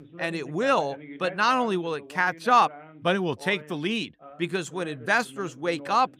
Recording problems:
voice in the background; noticeable; throughout; 20 dB below the speech

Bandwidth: 15.5 kHz